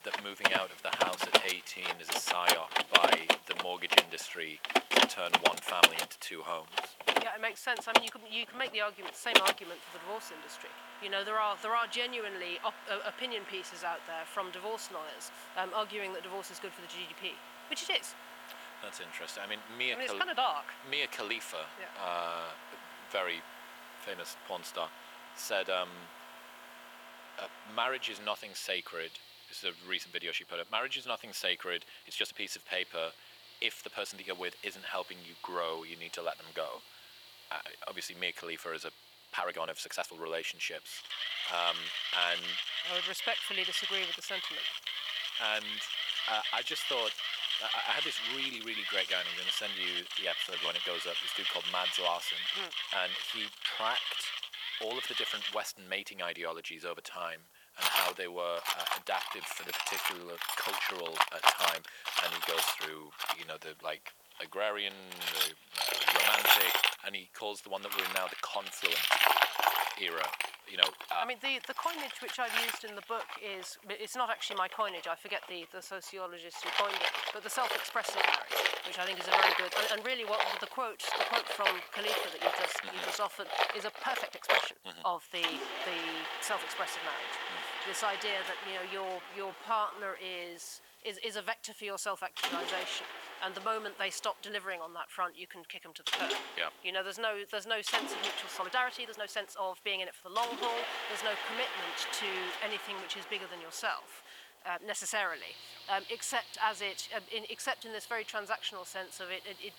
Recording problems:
thin; very; fading below 700 Hz
machinery noise; very loud; throughout; 5 dB above the speech
hiss; faint; throughout; 25 dB below the speech
uneven, jittery; strongly; from 1.5 s to 1:40

